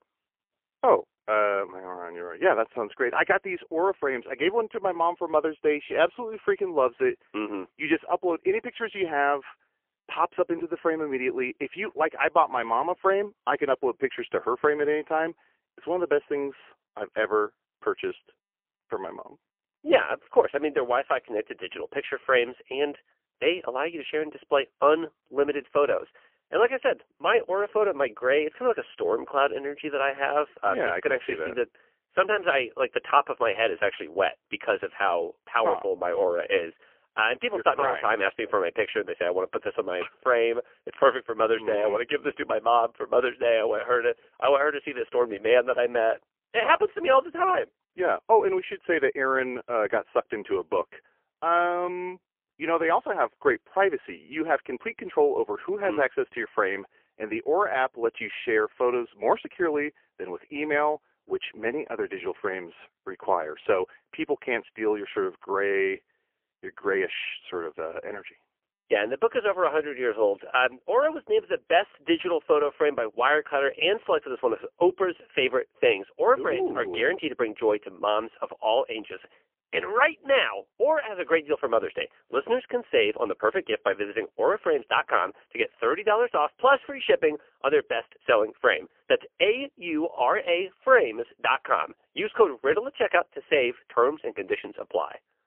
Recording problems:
phone-call audio; poor line; nothing above 3 kHz

